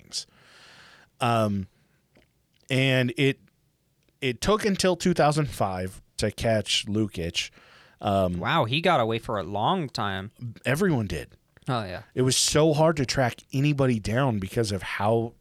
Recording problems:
none

